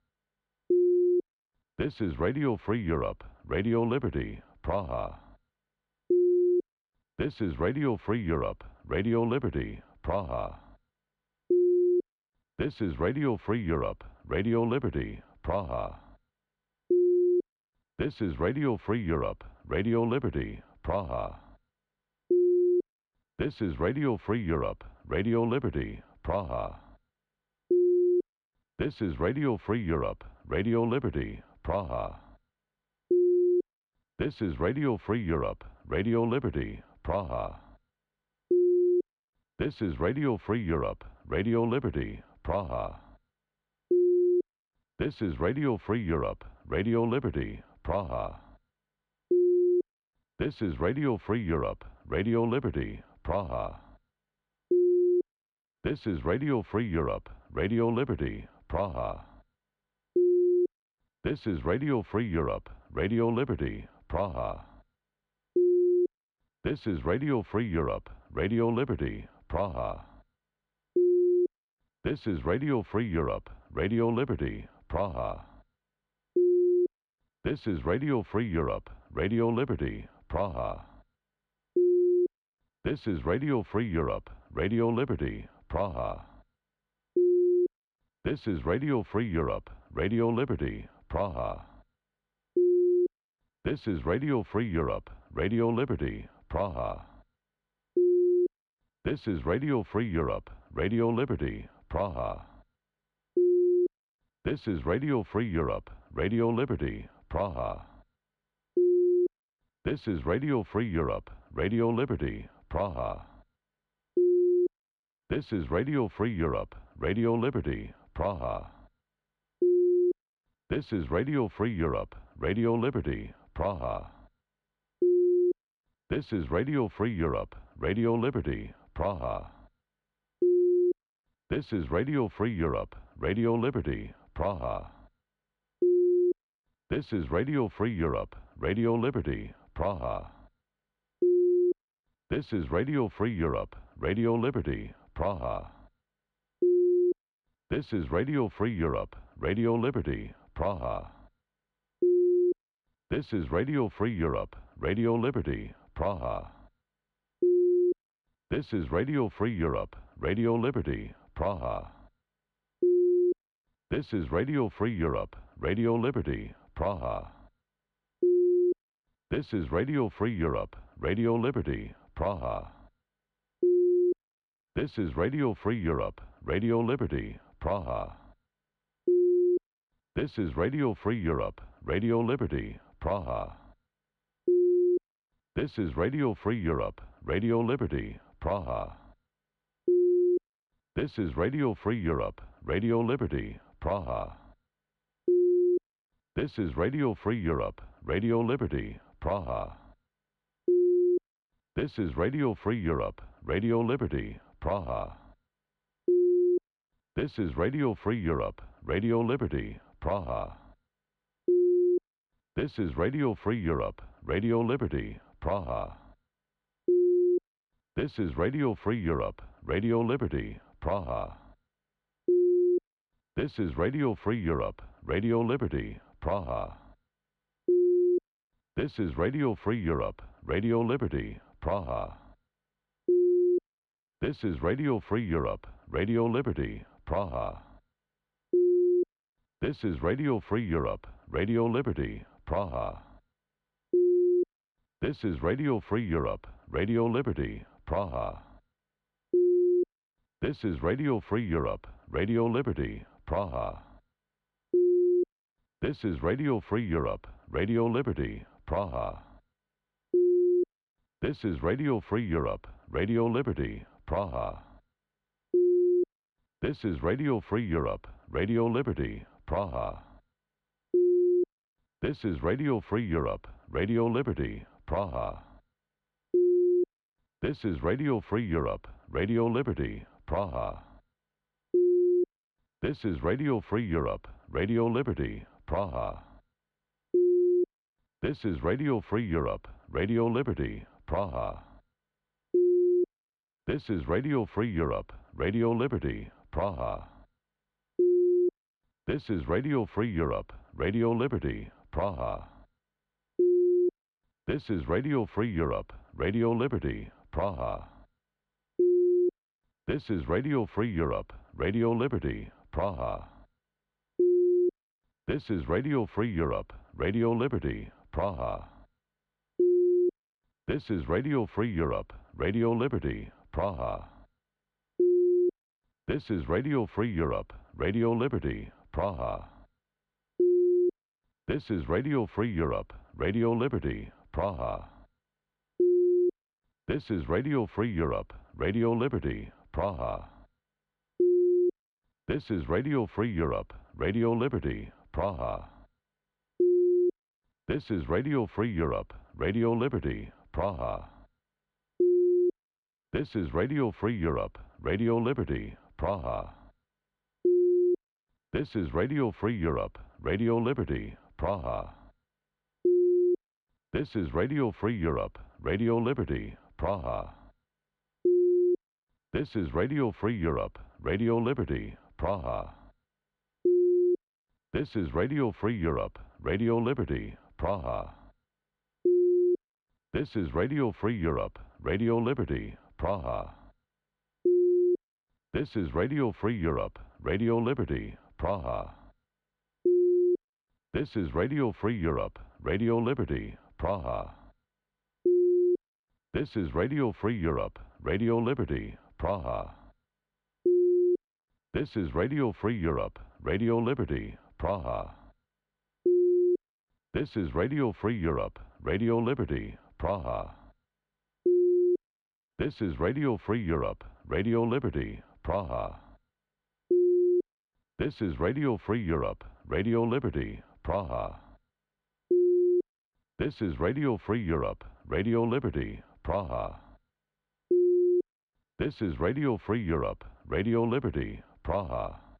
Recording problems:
muffled; slightly; fading above 3.5 kHz

